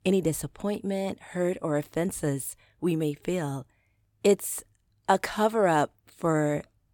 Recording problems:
none

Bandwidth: 17 kHz